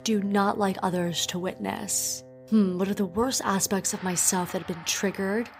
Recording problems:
background music; noticeable; throughout; 20 dB below the speech

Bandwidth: 15.5 kHz